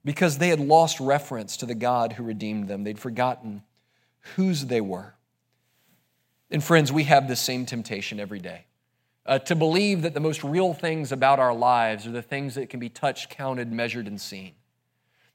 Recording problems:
none

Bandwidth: 16 kHz